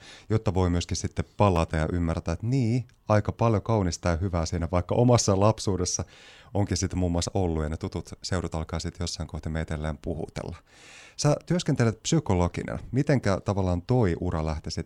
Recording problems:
none

